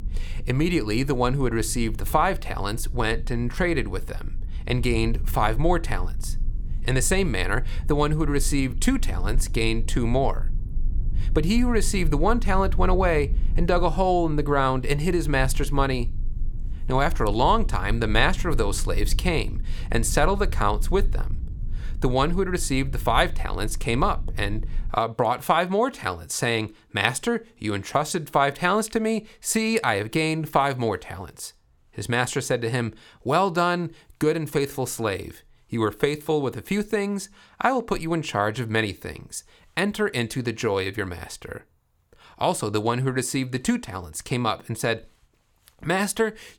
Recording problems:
low rumble; faint; until 25 s; 25 dB below the speech

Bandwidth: 18.5 kHz